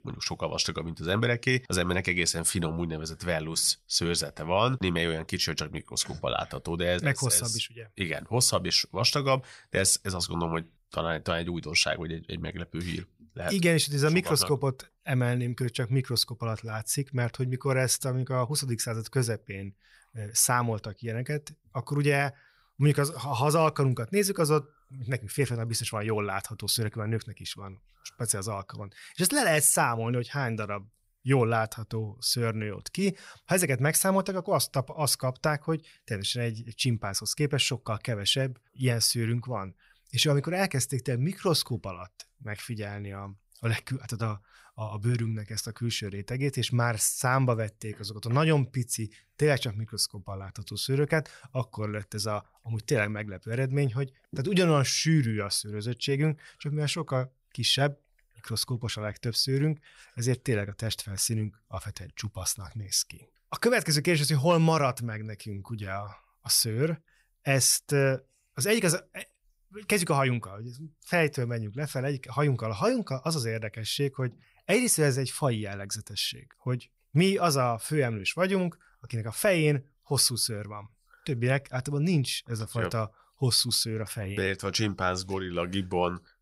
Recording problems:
none

